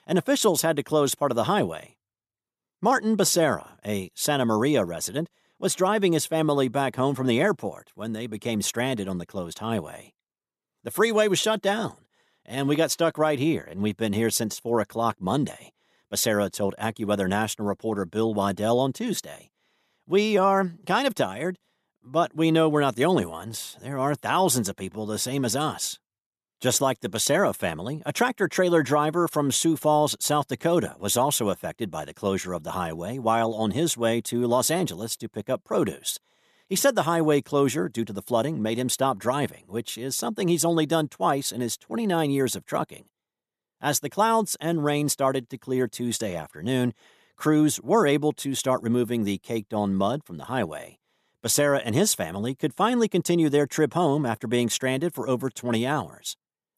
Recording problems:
none

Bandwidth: 14 kHz